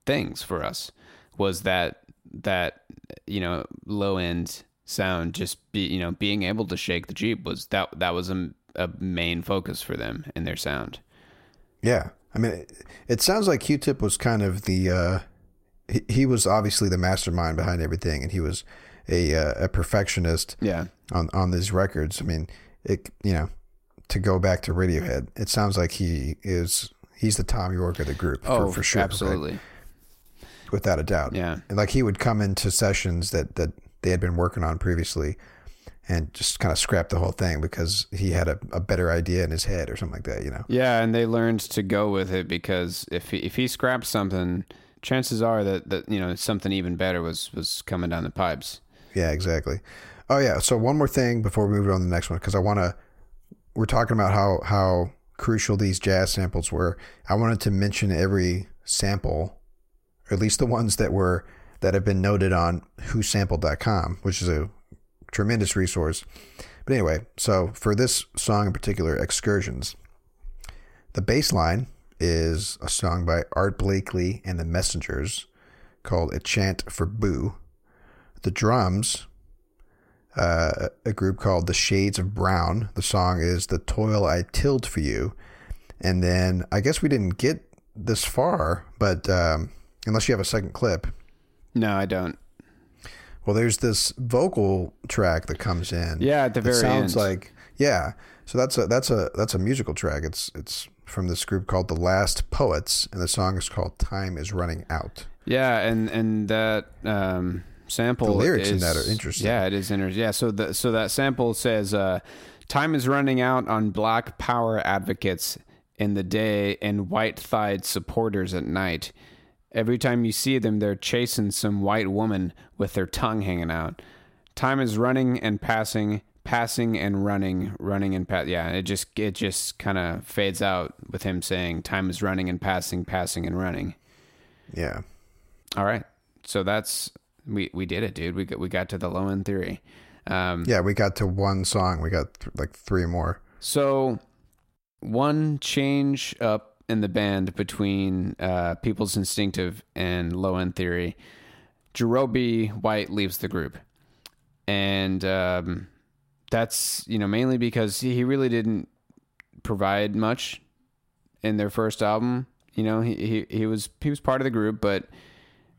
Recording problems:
none

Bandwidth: 16 kHz